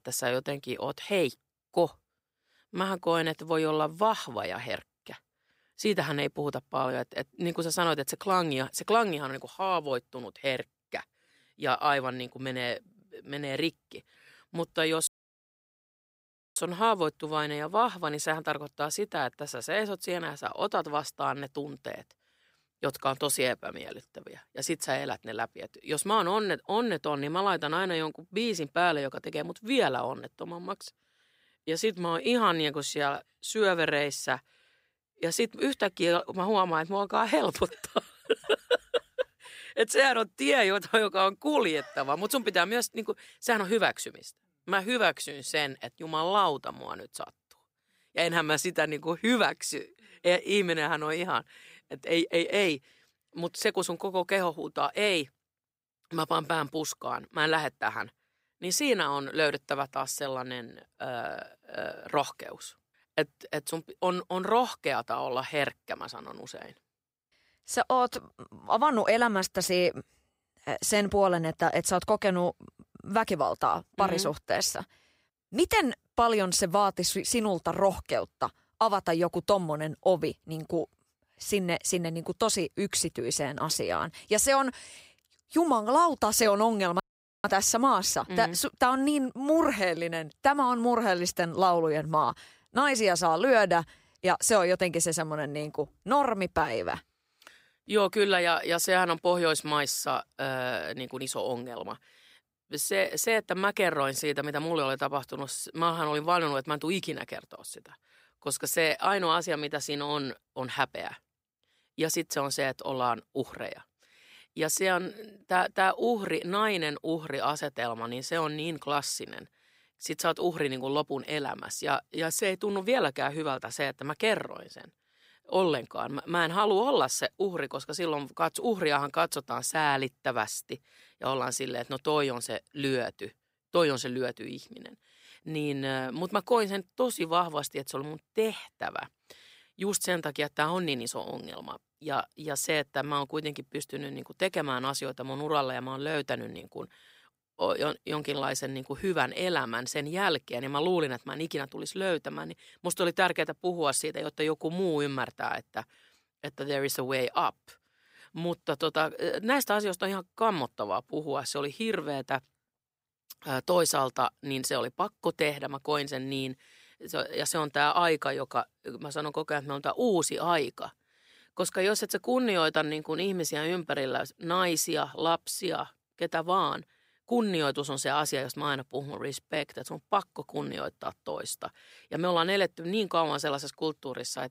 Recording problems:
audio cutting out; at 15 s for 1.5 s and at 1:27

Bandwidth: 15.5 kHz